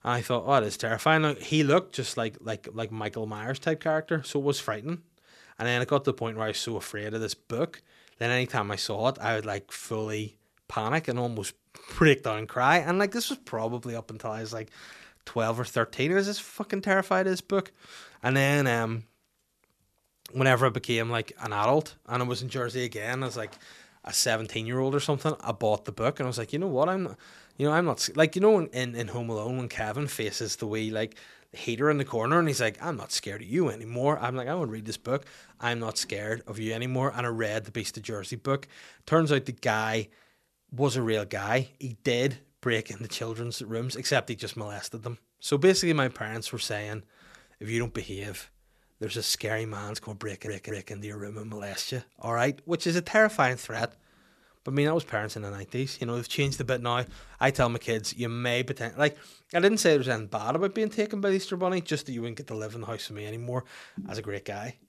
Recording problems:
audio stuttering; at 50 s

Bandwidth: 13.5 kHz